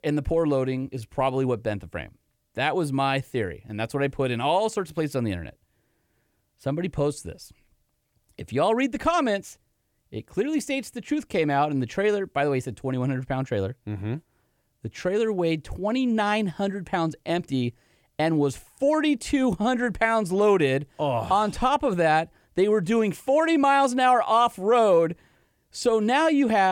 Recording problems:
abrupt cut into speech; at the end

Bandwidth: 18.5 kHz